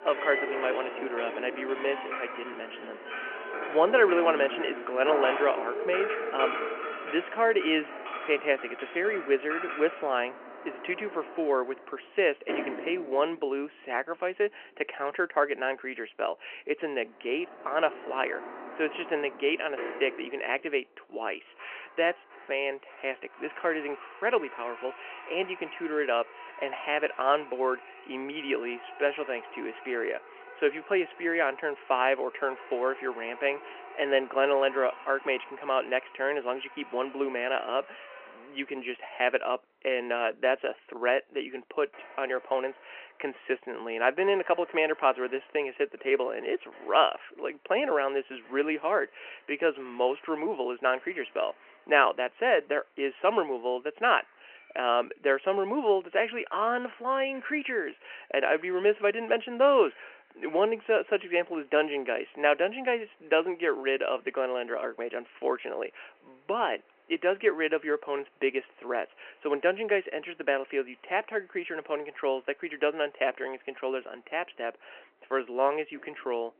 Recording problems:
phone-call audio; nothing above 3 kHz
household noises; noticeable; throughout; 10 dB below the speech

